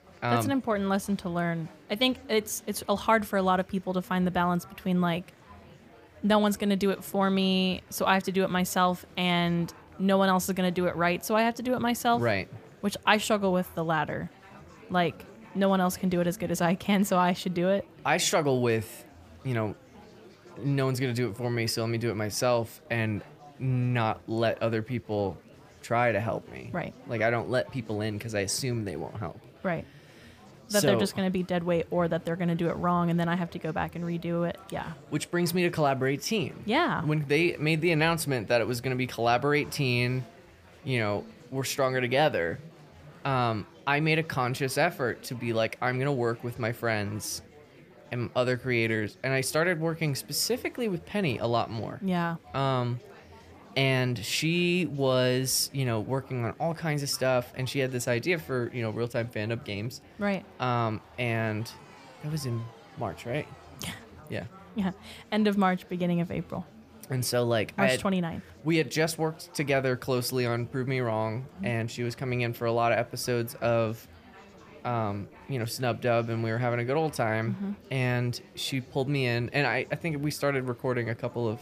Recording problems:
murmuring crowd; faint; throughout; 25 dB below the speech

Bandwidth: 15 kHz